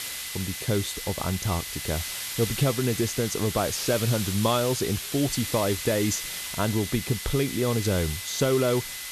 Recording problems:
hiss; loud; throughout; 5 dB below the speech
high-pitched whine; noticeable; until 3.5 s and from 5.5 s on; 2 kHz, 15 dB below the speech

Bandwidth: 13.5 kHz